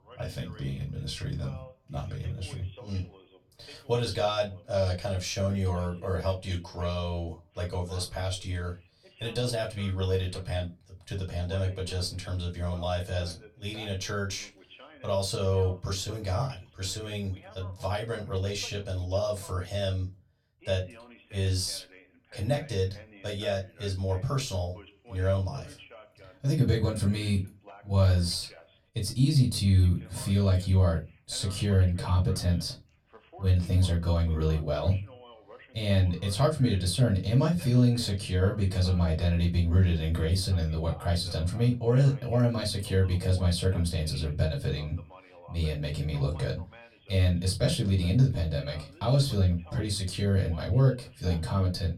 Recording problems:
off-mic speech; far
room echo; very slight; dies away in 0.2 s
voice in the background; faint; throughout; 25 dB below the speech

